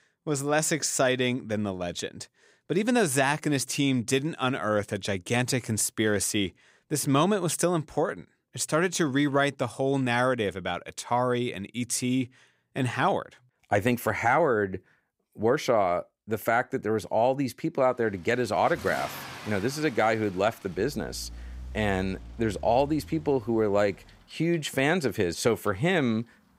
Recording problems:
traffic noise; noticeable; from 18 s on; 15 dB below the speech

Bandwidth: 15.5 kHz